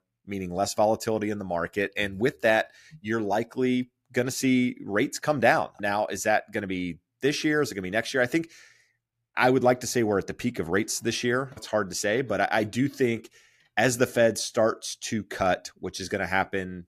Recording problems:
none

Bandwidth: 14.5 kHz